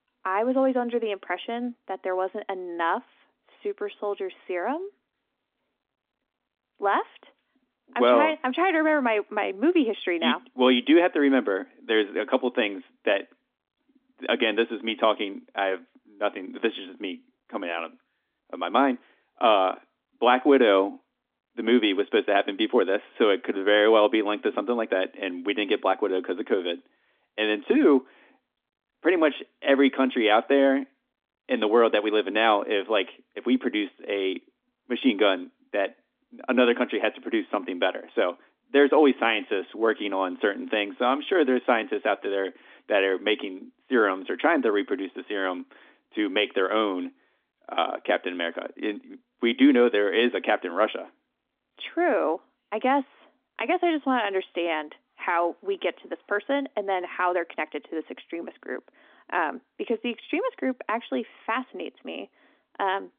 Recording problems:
phone-call audio; nothing above 3.5 kHz

